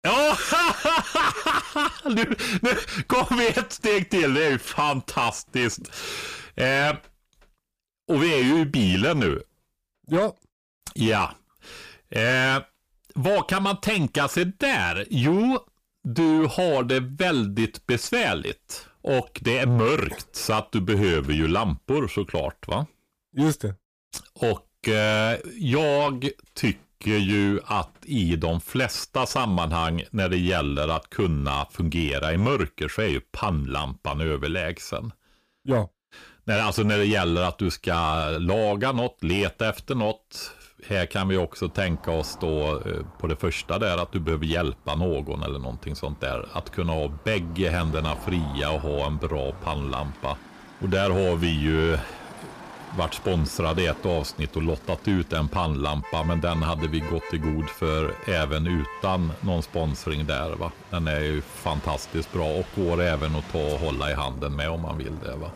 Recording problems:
distortion; heavy; 7 dB below the speech
traffic noise; noticeable; from 42 s on; 20 dB below the speech

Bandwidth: 15 kHz